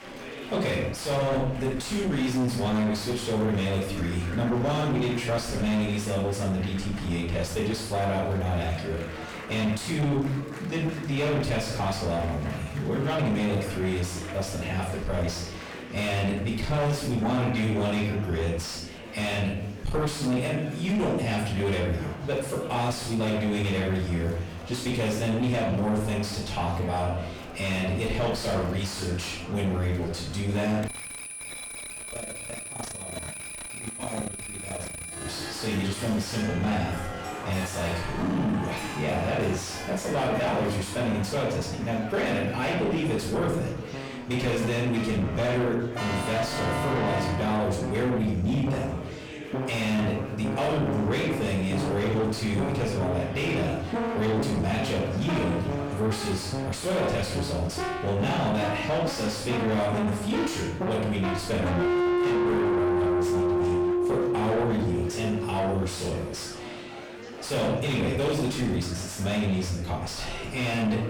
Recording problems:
distortion; heavy; 5 dB below the speech
off-mic speech; far
room echo; noticeable; dies away in 0.6 s
background music; loud; throughout; 3 dB below the speech
chatter from many people; noticeable; throughout; 15 dB below the speech
alarm; noticeable; from 31 to 35 s; peak 2 dB below the speech

